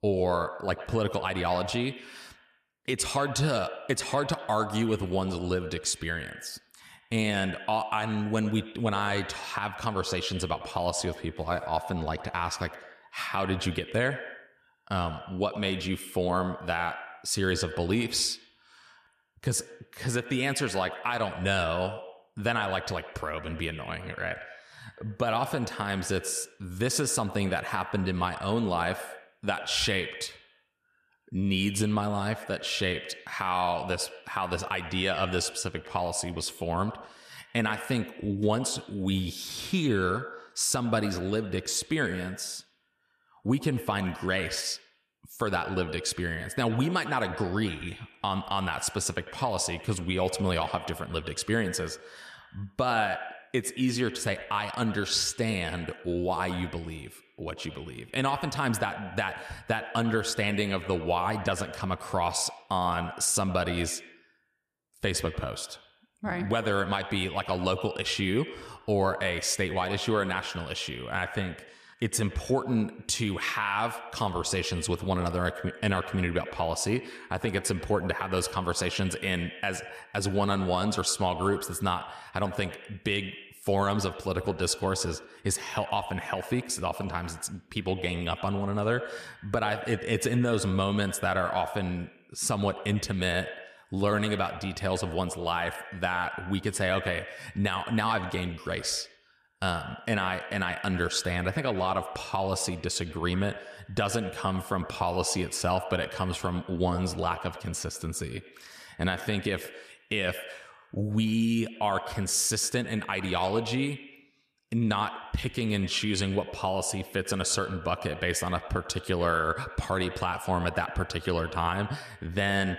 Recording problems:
echo of what is said; noticeable; throughout; 100 ms later, 10 dB below the speech

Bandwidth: 14.5 kHz